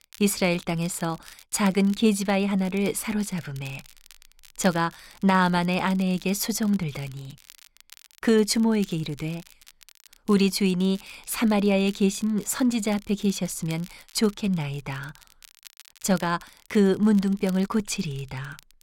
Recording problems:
crackle, like an old record; faint; 25 dB below the speech

